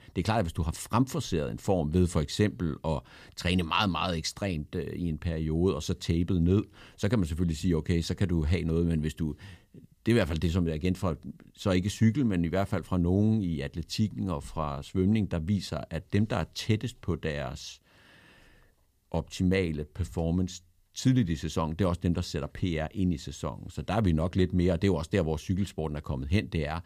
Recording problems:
none

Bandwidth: 15 kHz